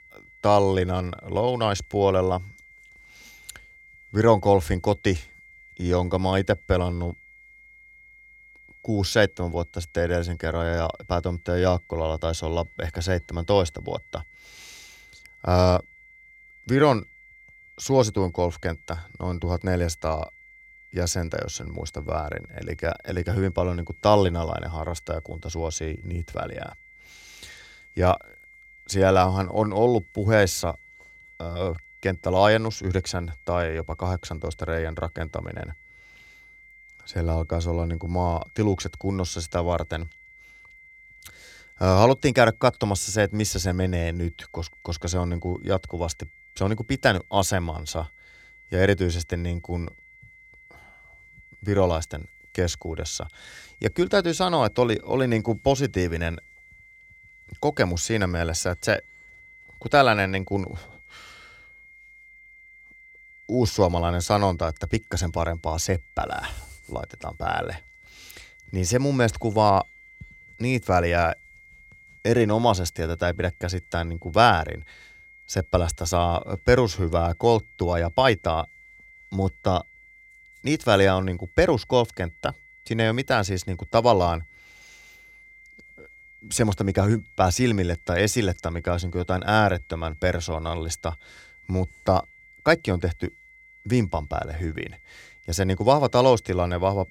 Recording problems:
high-pitched whine; faint; throughout; 2 kHz, 25 dB below the speech

